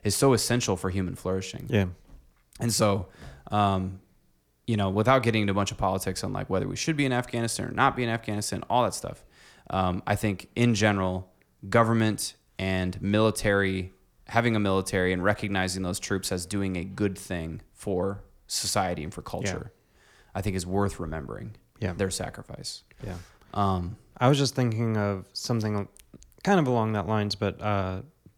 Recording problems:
none

